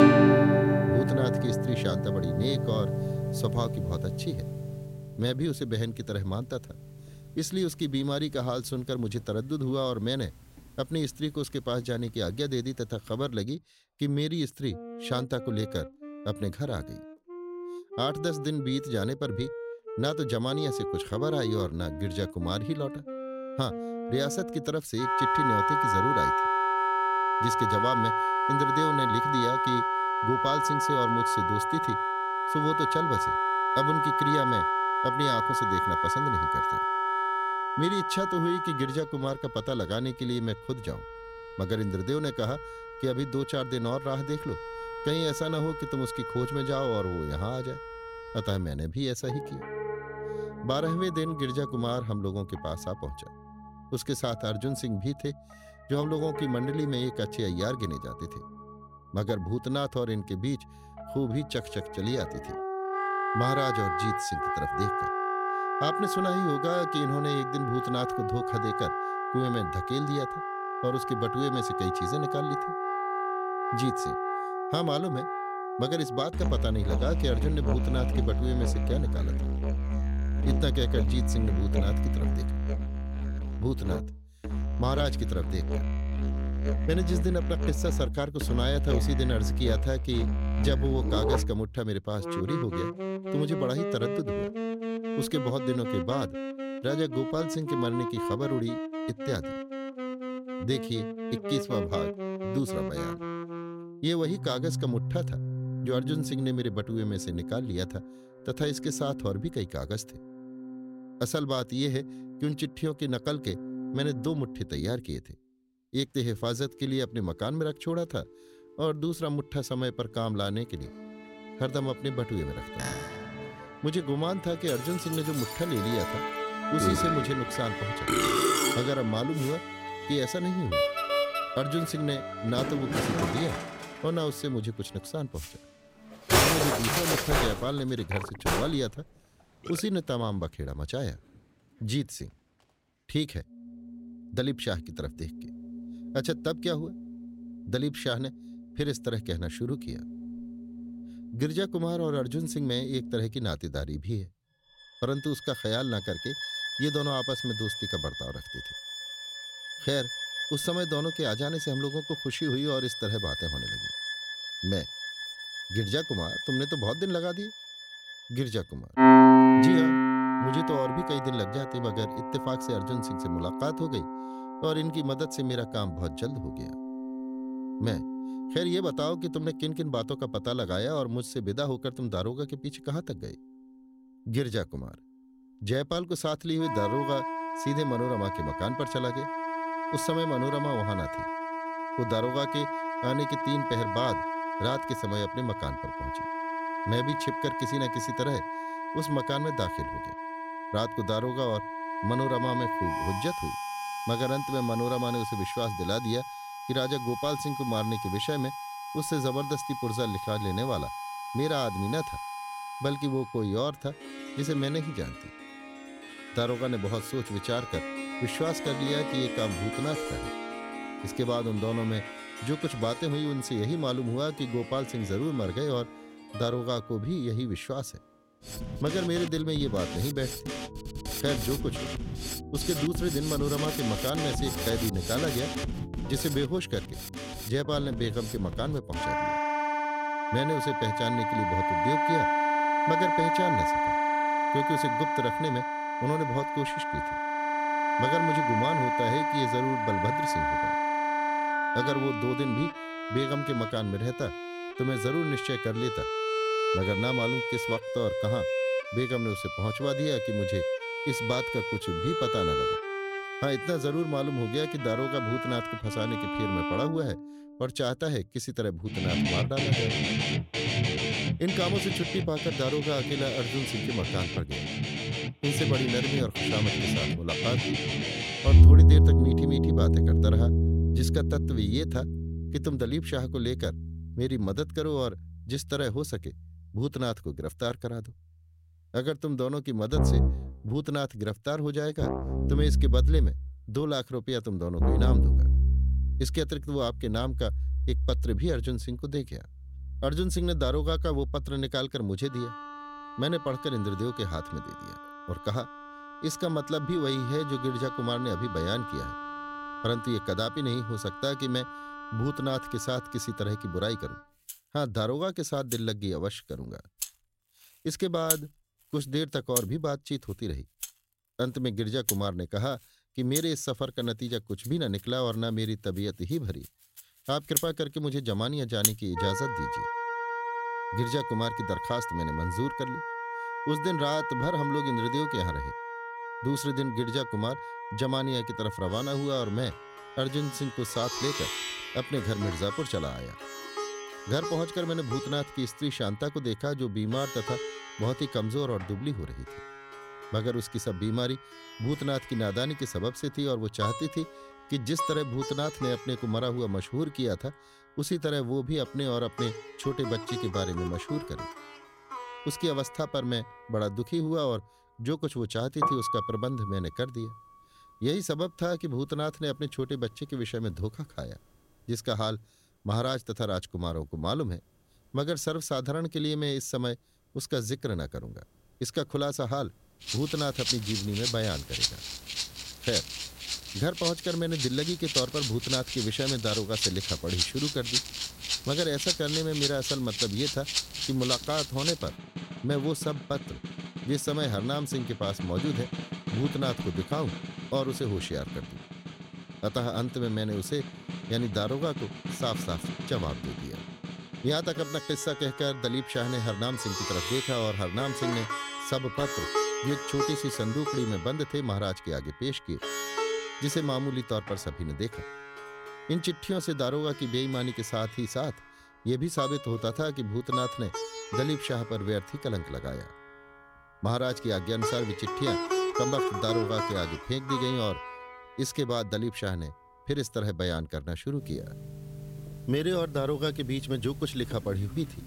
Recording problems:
background music; very loud; throughout; 1 dB above the speech

